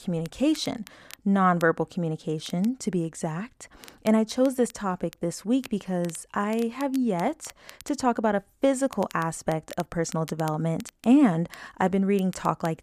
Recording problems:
crackle, like an old record; faint; 20 dB below the speech

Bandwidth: 14.5 kHz